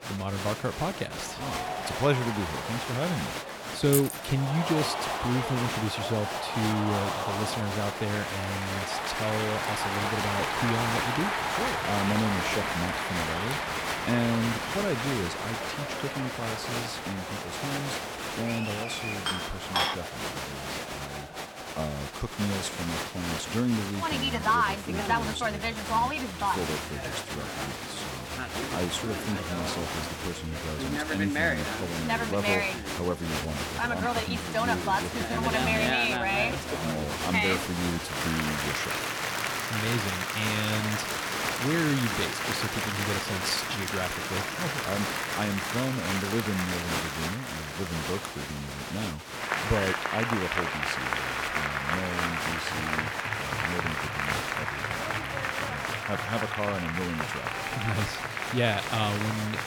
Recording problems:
crowd noise; very loud; throughout; 2 dB above the speech
jangling keys; loud; at 4 s; peak 3 dB above the speech
clattering dishes; loud; at 19 s; peak 5 dB above the speech
alarm; noticeable; from 39 to 46 s; peak 7 dB below the speech

